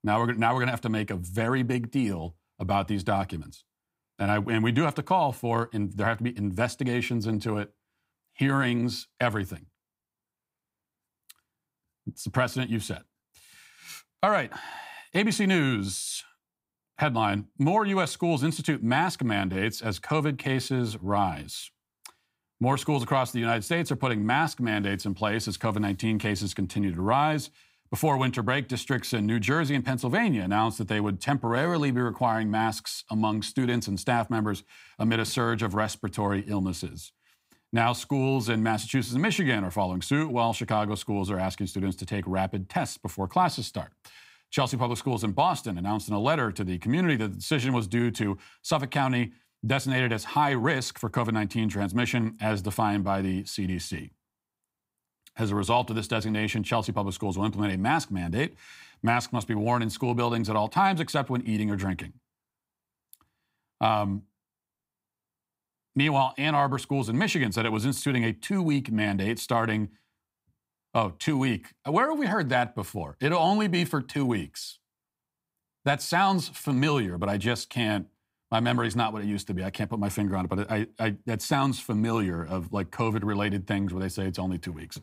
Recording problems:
none

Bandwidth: 15.5 kHz